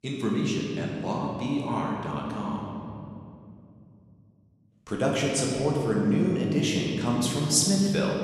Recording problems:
room echo; noticeable; dies away in 2.5 s
off-mic speech; somewhat distant

